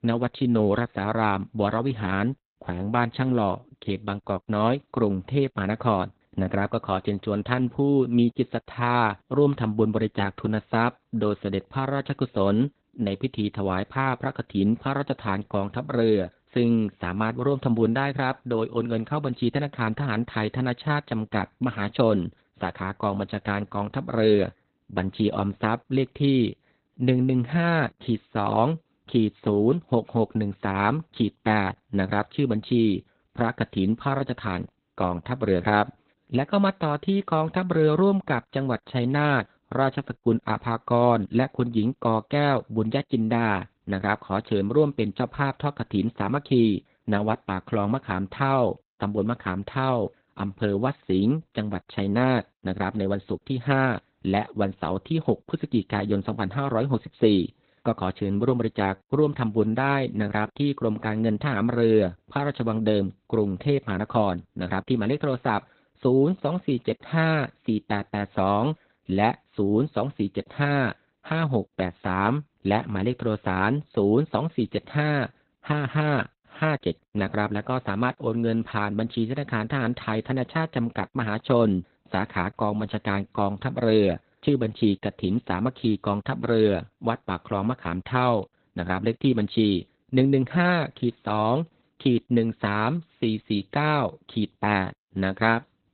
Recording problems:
garbled, watery; badly; nothing above 4 kHz

